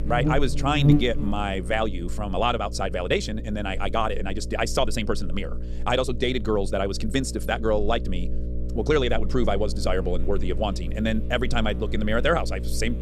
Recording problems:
wrong speed, natural pitch; too fast; 1.7 times normal speed
electrical hum; noticeable; throughout; 60 Hz, 15 dB below the speech

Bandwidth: 14 kHz